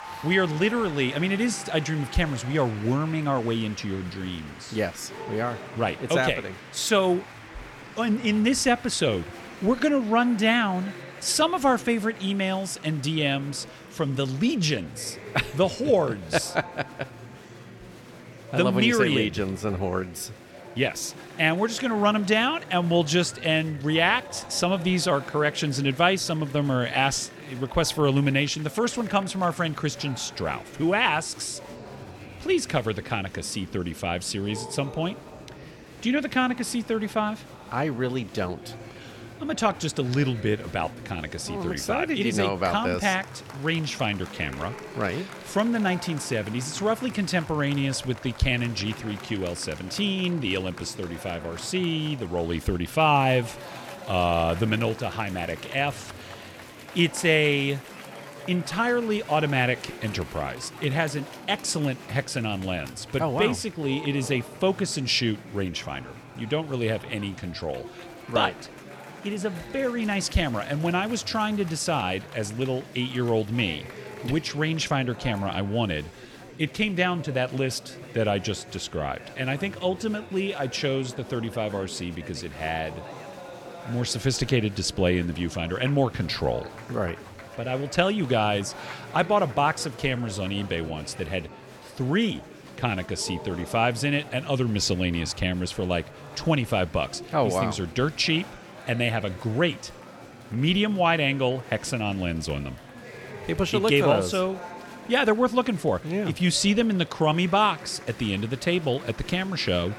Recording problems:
murmuring crowd; noticeable; throughout; 15 dB below the speech

